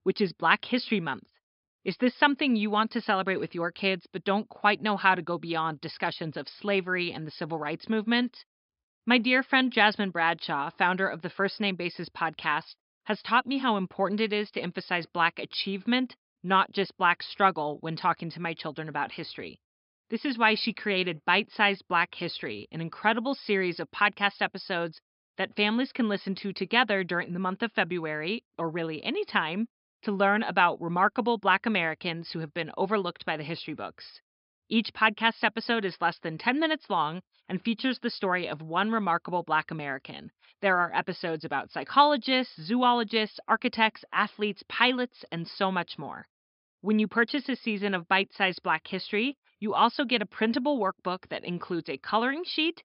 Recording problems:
high frequencies cut off; noticeable; nothing above 5.5 kHz

